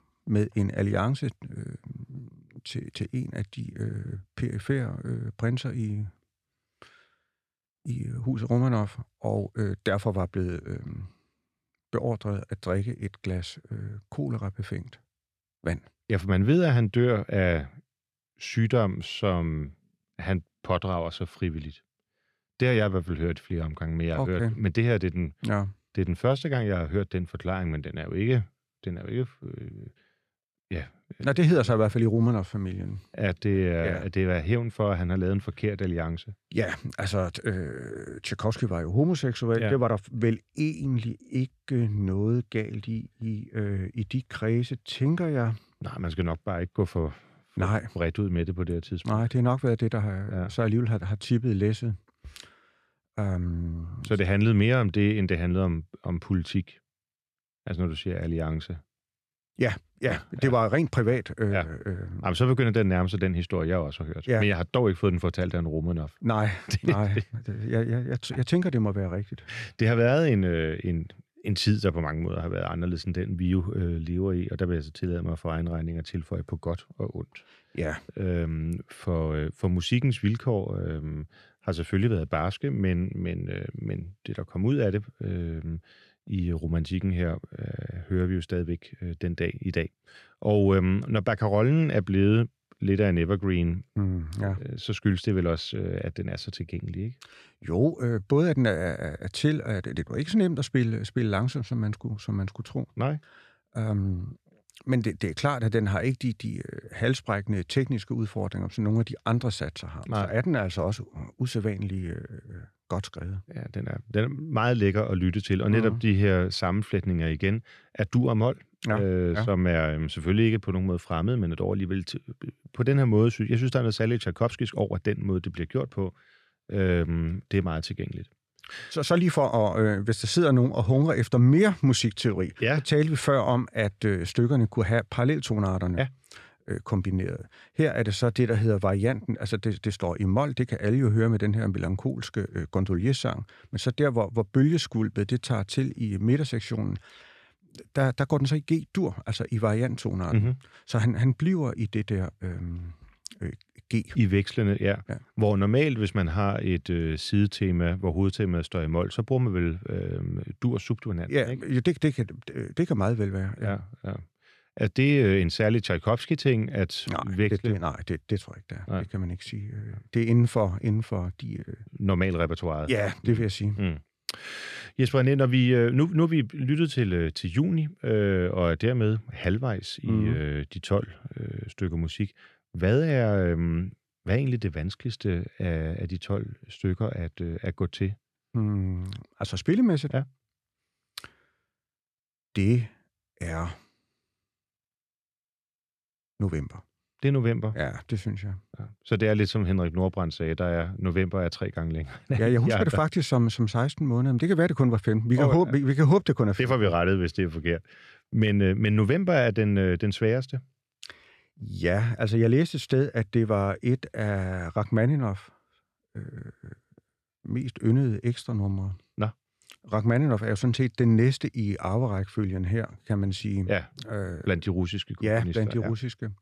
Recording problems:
none

